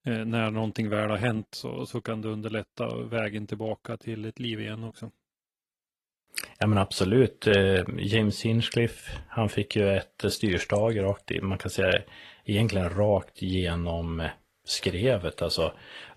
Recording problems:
garbled, watery; slightly

